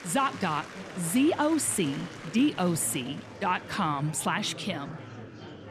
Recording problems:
murmuring crowd; noticeable; throughout; 15 dB below the speech

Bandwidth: 14 kHz